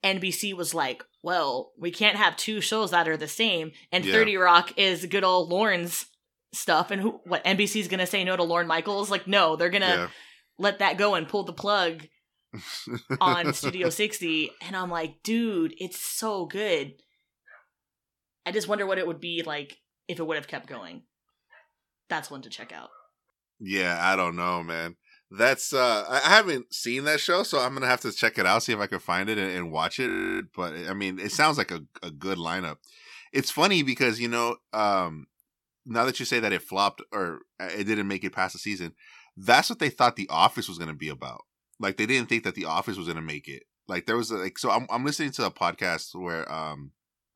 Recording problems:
audio freezing; at 30 s

